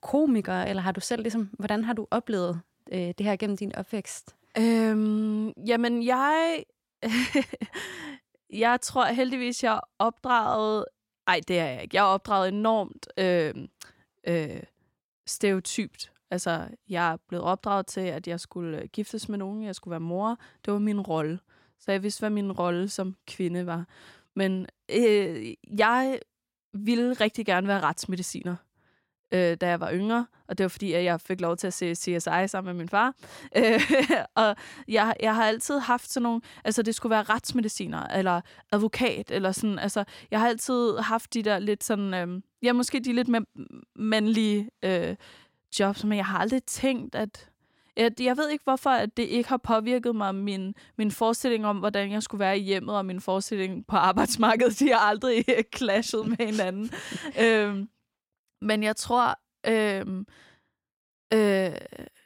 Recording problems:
none

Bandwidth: 16.5 kHz